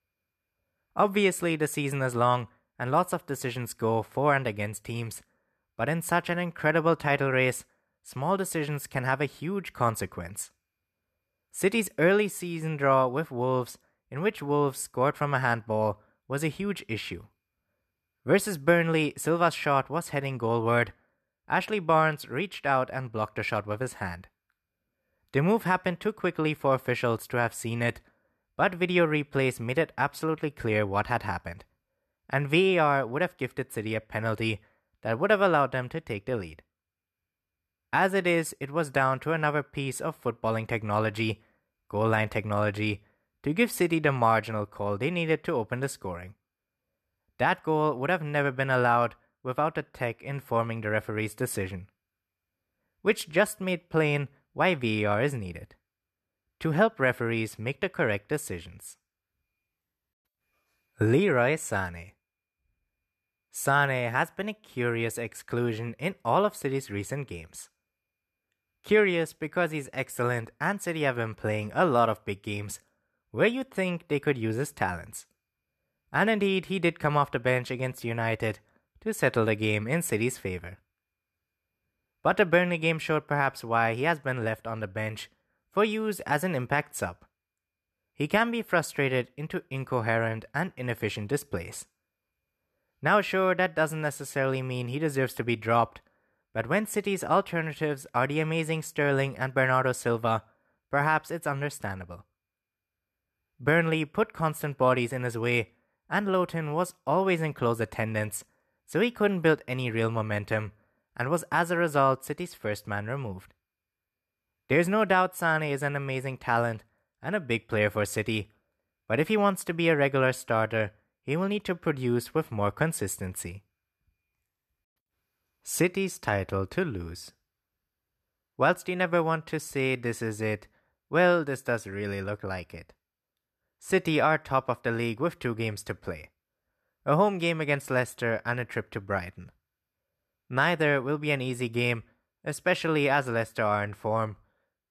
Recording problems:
none

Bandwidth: 13.5 kHz